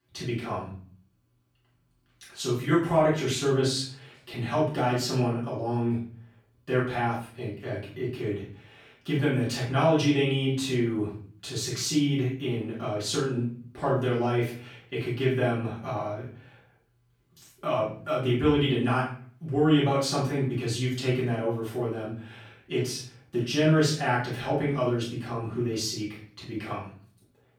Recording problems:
off-mic speech; far
room echo; noticeable; dies away in 0.5 s

